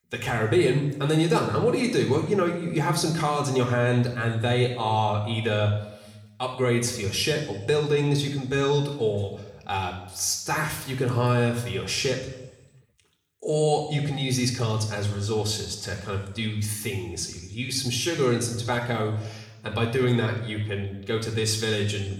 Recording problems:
room echo; slight; dies away in 0.9 s
off-mic speech; somewhat distant

